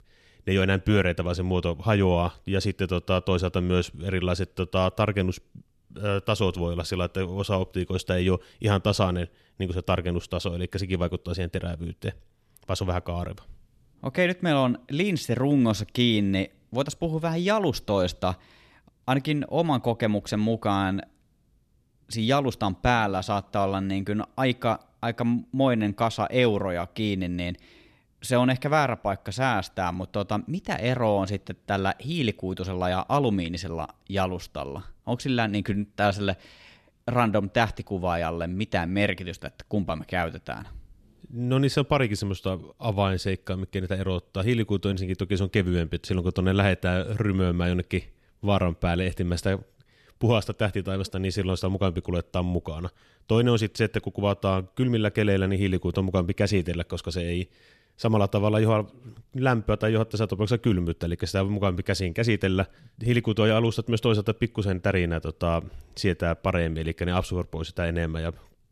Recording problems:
none

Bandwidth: 14 kHz